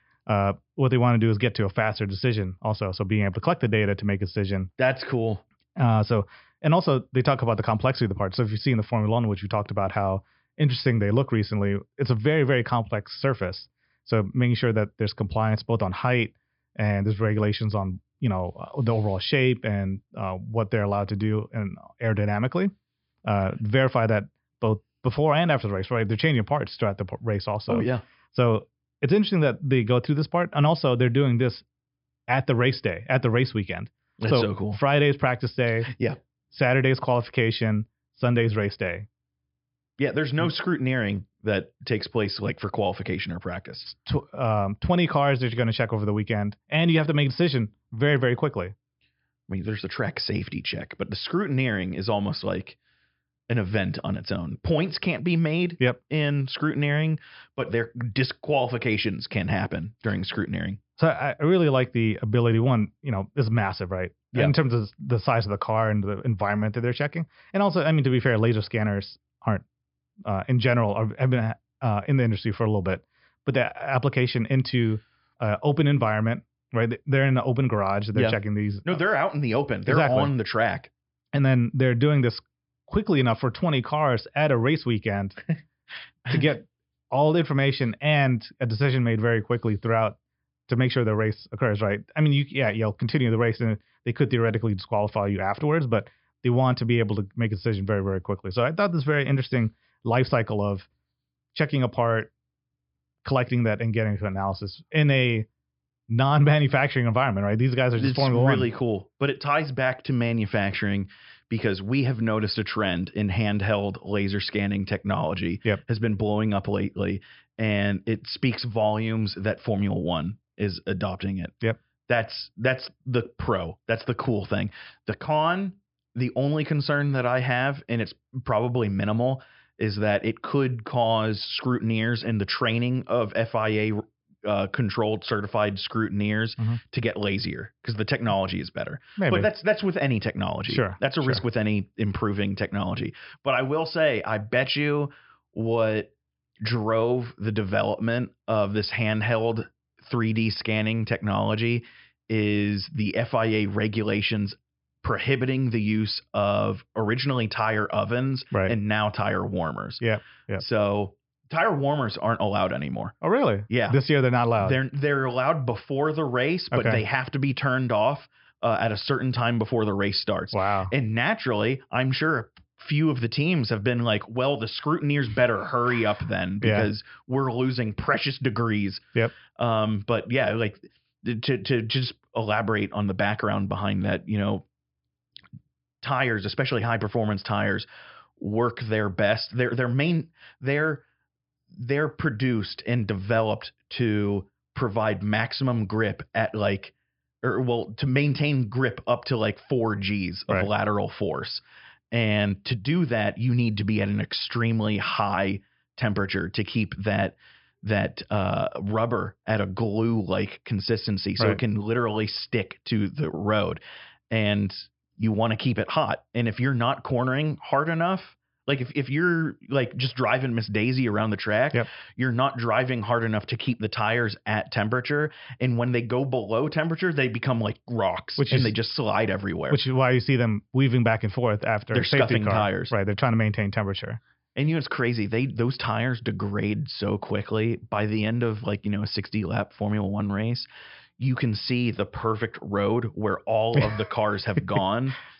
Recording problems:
high frequencies cut off; noticeable; nothing above 5.5 kHz

